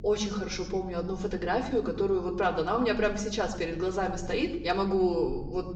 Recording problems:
off-mic speech; far
high frequencies cut off; noticeable; nothing above 8 kHz
room echo; slight; dies away in 0.7 s
electrical hum; faint; throughout; 50 Hz, 25 dB below the speech

